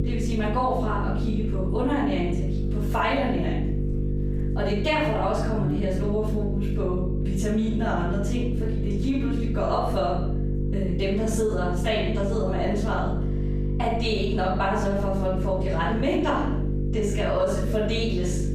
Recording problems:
off-mic speech; far
room echo; noticeable; dies away in 0.6 s
squashed, flat; somewhat
electrical hum; noticeable; throughout; 50 Hz, 10 dB below the speech

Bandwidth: 15 kHz